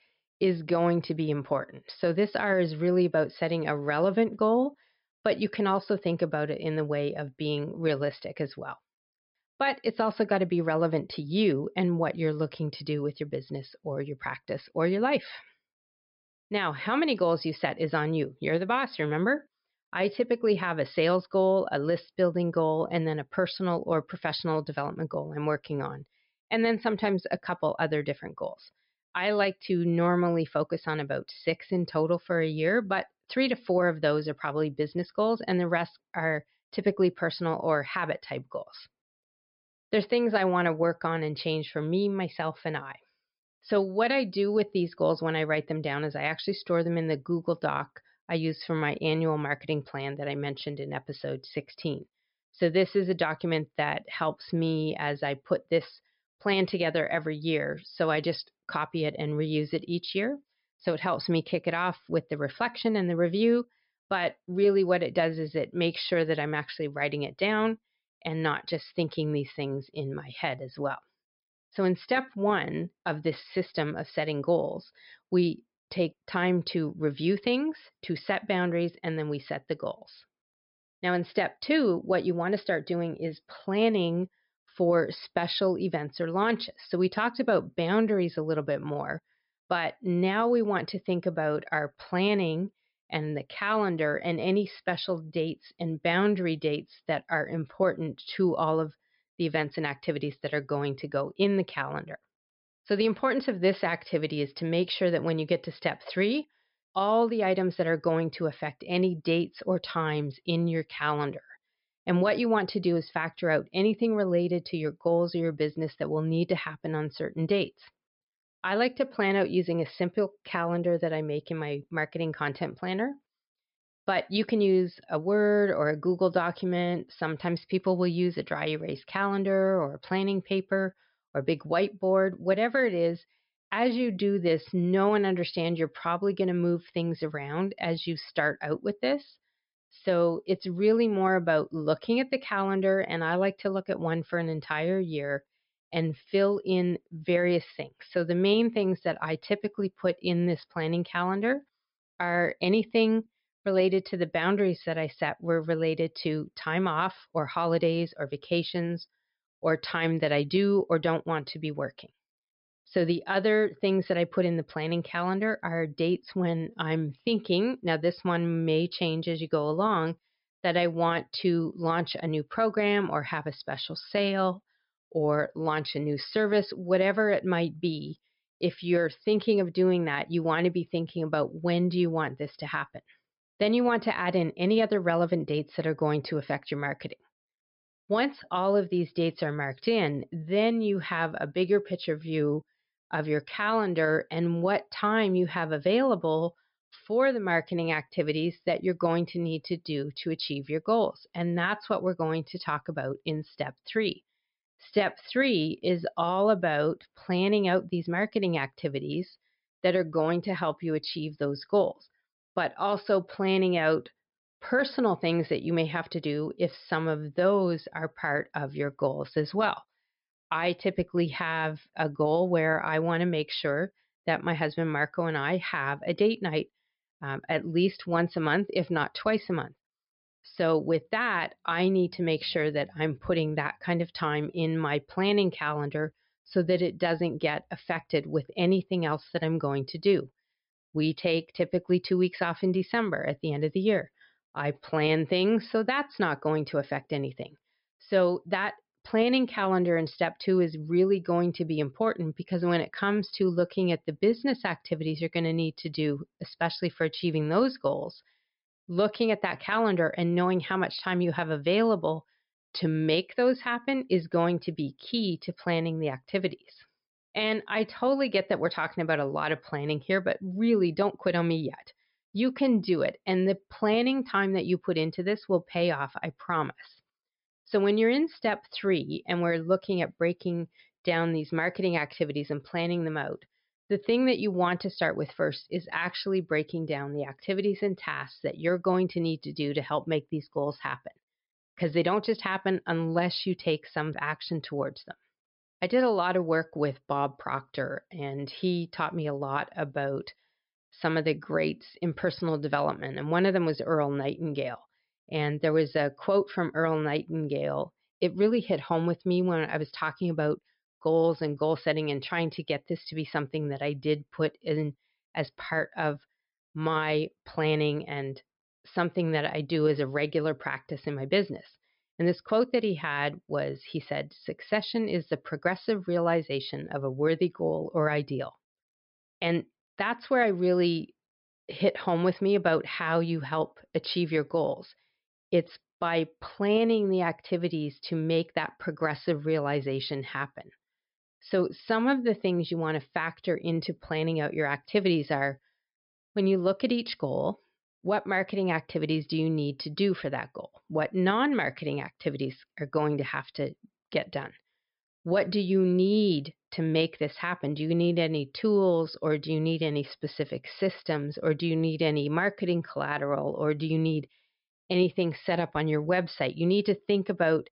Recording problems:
high frequencies cut off; noticeable; nothing above 5.5 kHz

